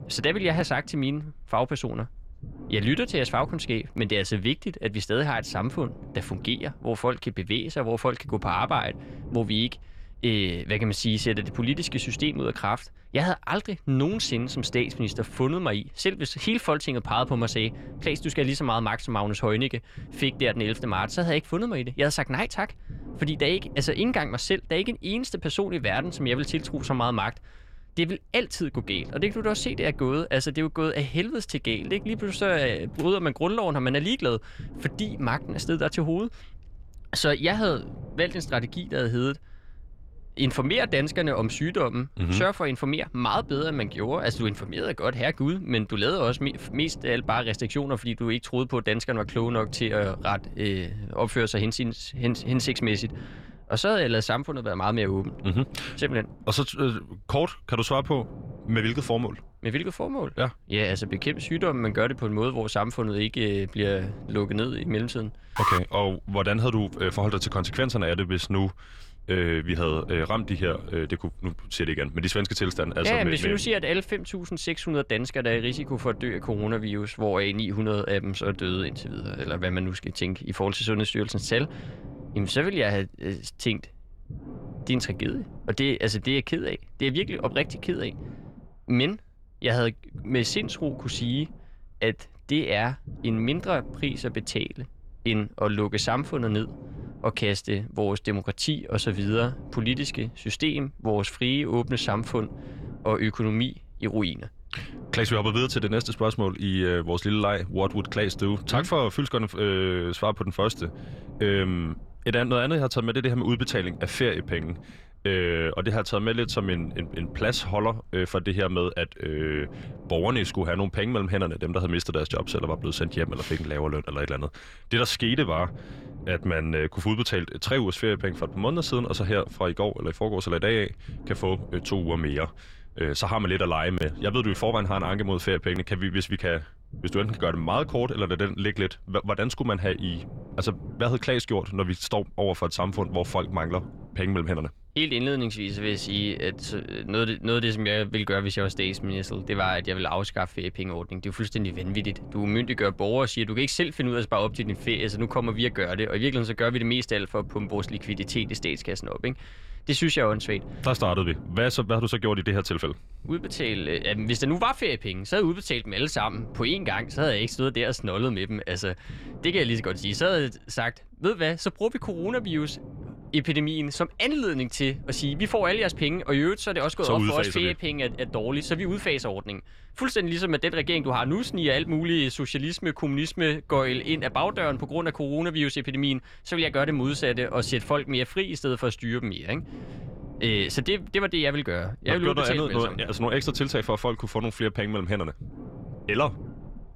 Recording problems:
low rumble; faint; throughout; 20 dB below the speech
alarm; loud; at 1:06; peak 2 dB above the speech

